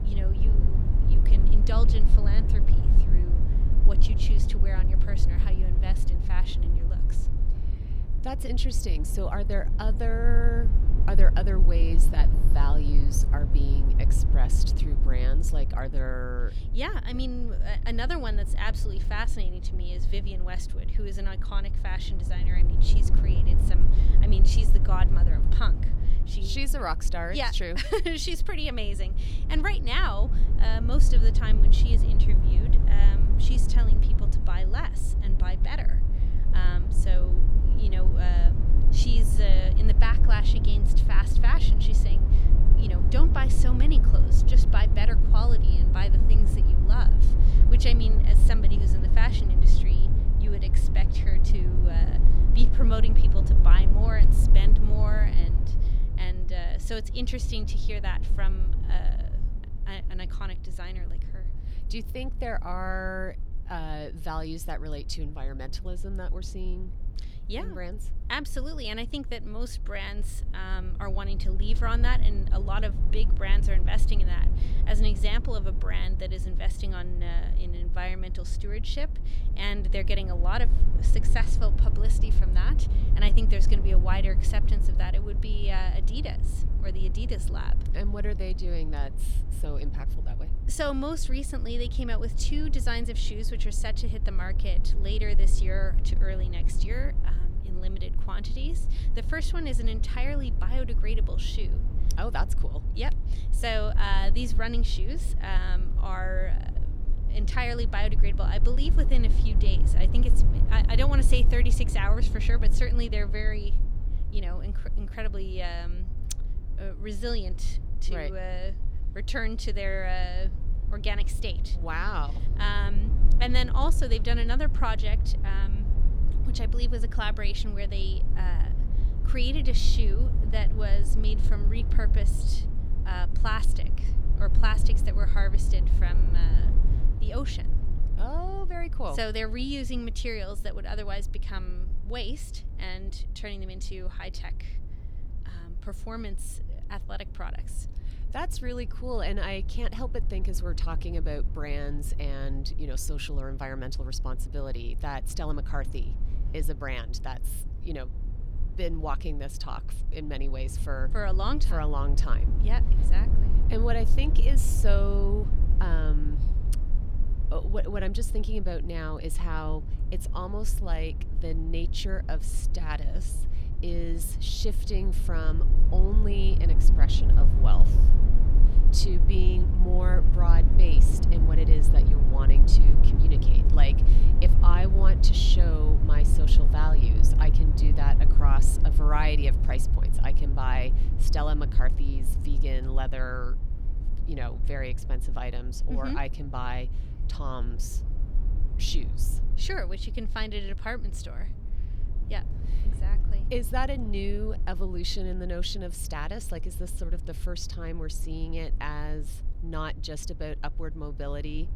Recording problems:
low rumble; loud; throughout; 9 dB below the speech

